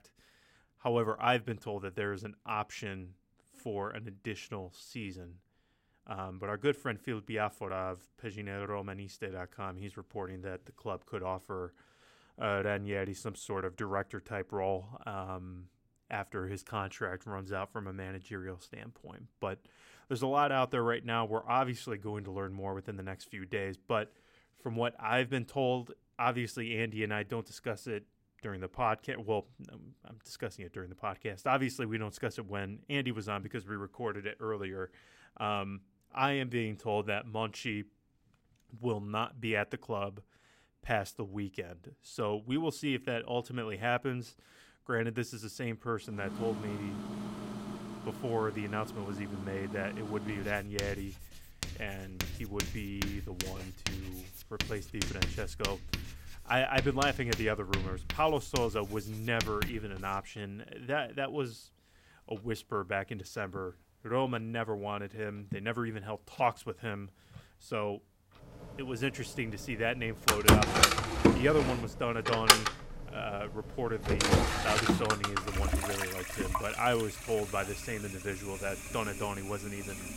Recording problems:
household noises; very loud; from 46 s on; 3 dB above the speech

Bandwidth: 16 kHz